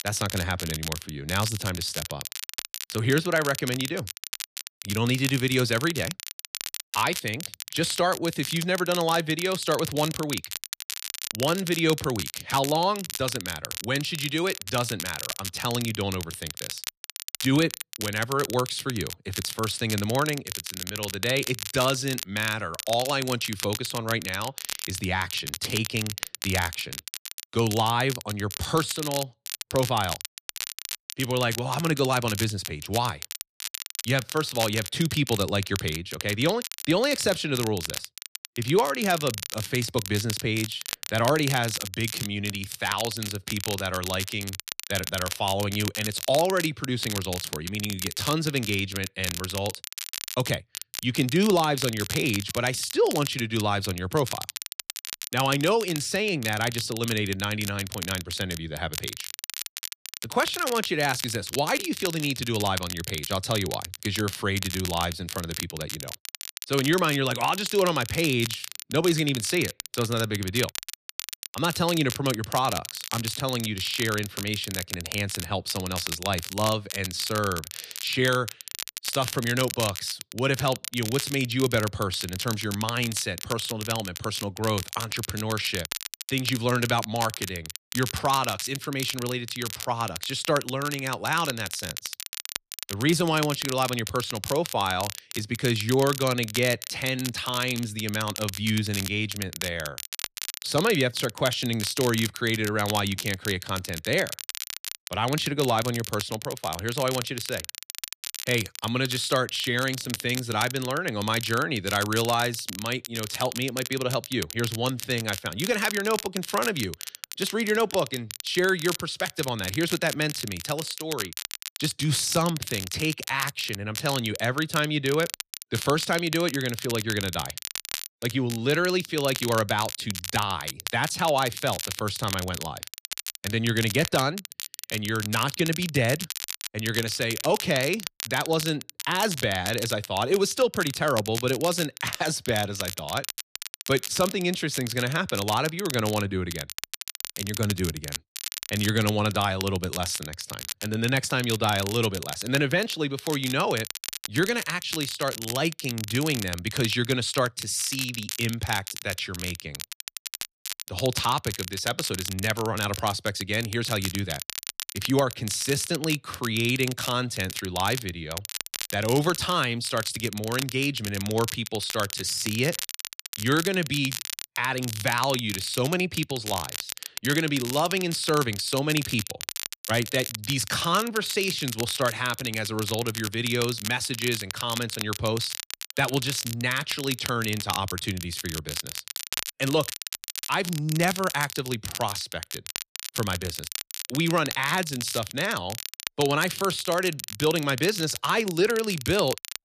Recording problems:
crackle, like an old record; loud; 7 dB below the speech

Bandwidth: 14.5 kHz